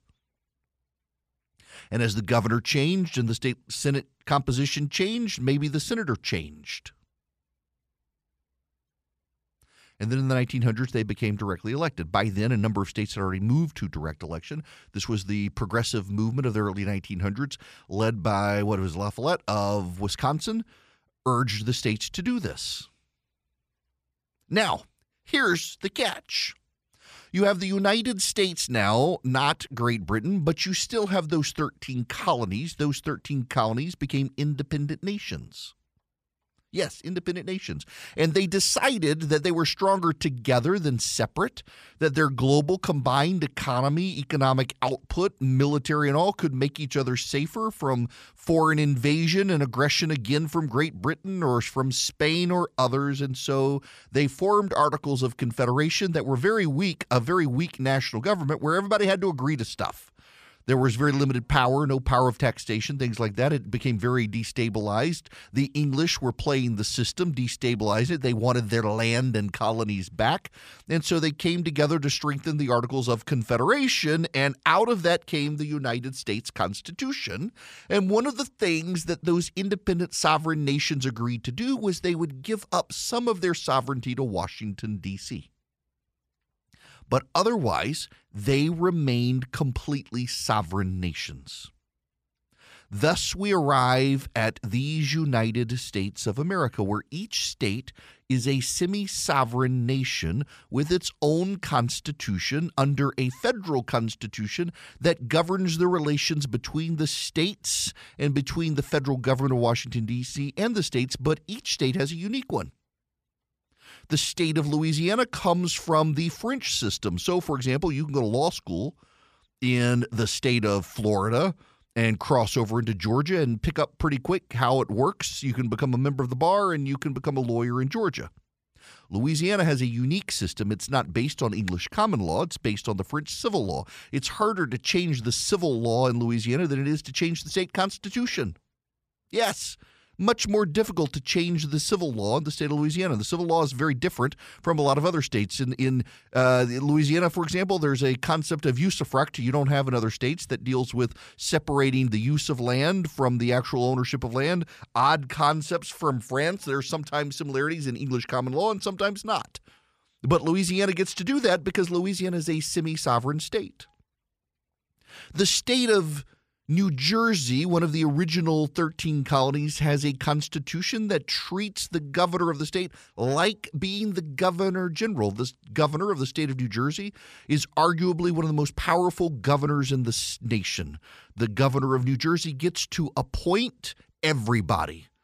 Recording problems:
none

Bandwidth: 14.5 kHz